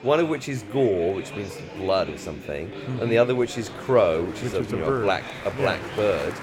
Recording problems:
murmuring crowd; noticeable; throughout; 10 dB below the speech

